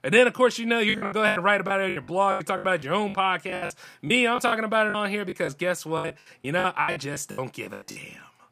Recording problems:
choppy; very; 17% of the speech affected

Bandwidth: 15 kHz